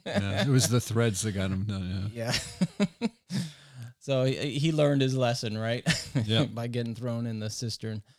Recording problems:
none

